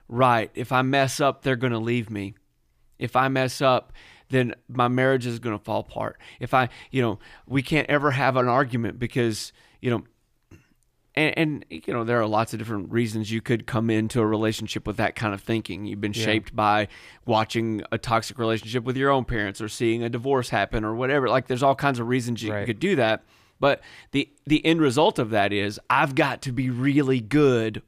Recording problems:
none

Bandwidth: 15 kHz